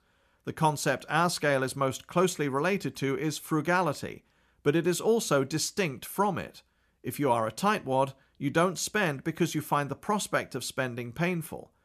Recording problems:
none

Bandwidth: 14.5 kHz